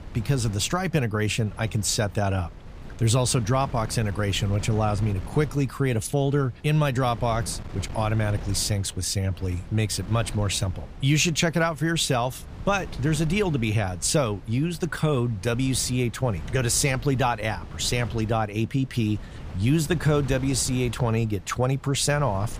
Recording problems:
wind noise on the microphone; occasional gusts; 20 dB below the speech

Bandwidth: 15 kHz